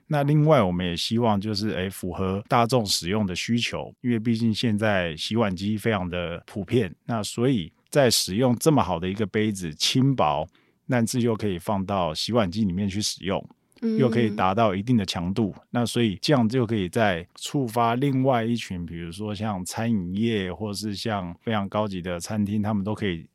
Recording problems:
none

